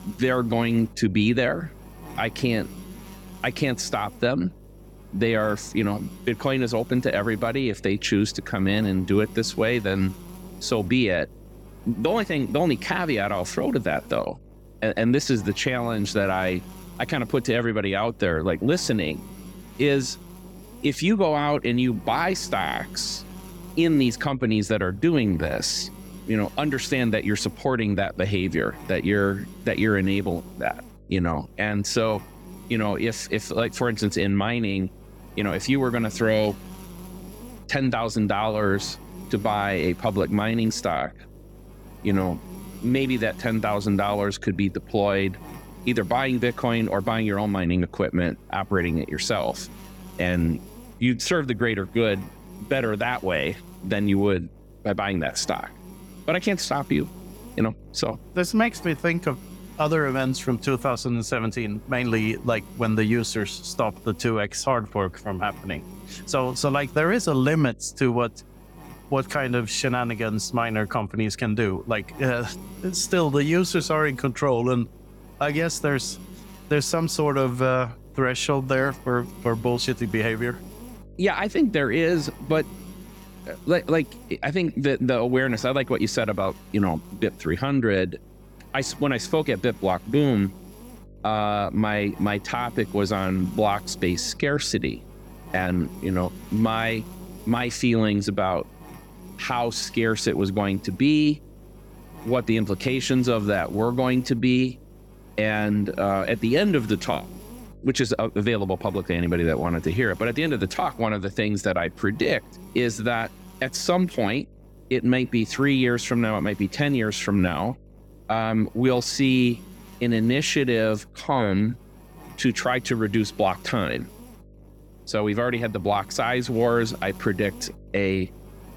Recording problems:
electrical hum; faint; throughout; 50 Hz, 20 dB below the speech

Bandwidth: 17 kHz